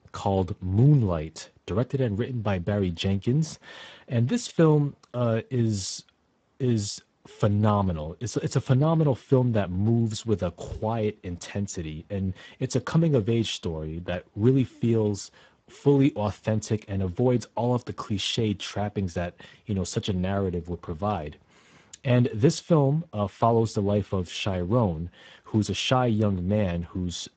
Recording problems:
garbled, watery; badly; nothing above 8 kHz

